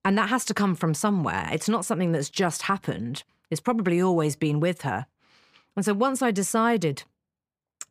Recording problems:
none

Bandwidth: 15 kHz